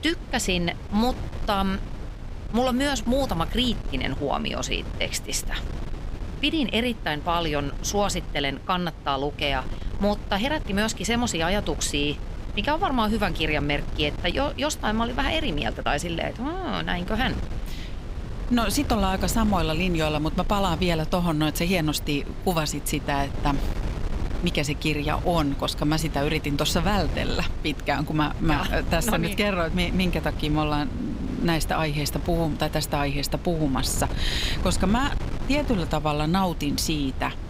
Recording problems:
wind noise on the microphone; occasional gusts; 15 dB below the speech

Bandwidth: 15.5 kHz